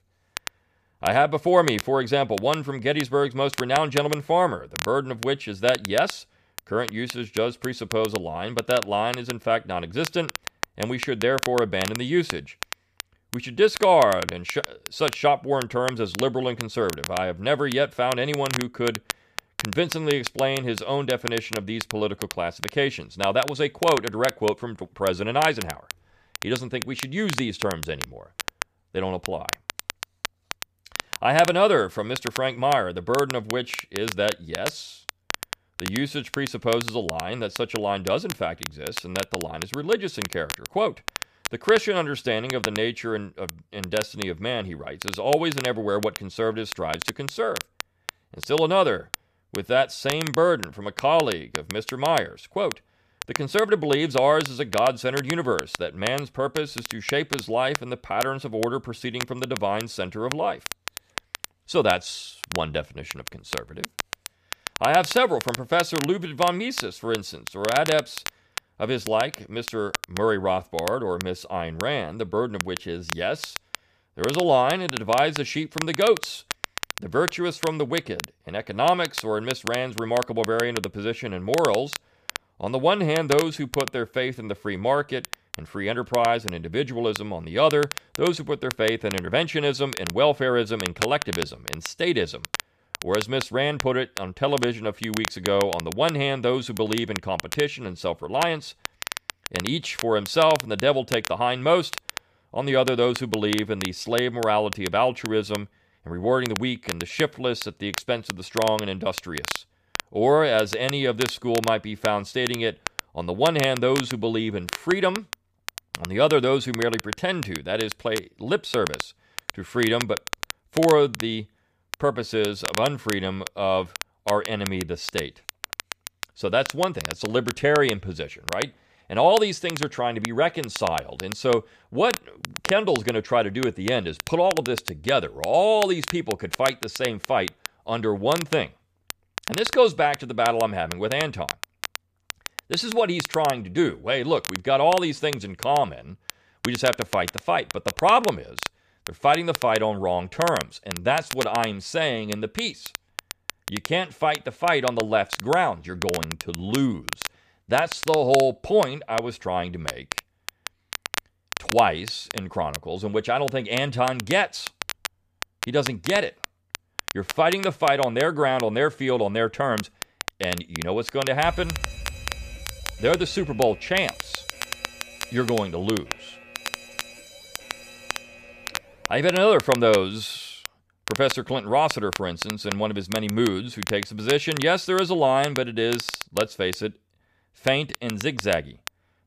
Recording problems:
crackle, like an old record; loud; 10 dB below the speech
alarm; faint; from 2:51 to 2:59; peak 10 dB below the speech

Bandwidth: 14.5 kHz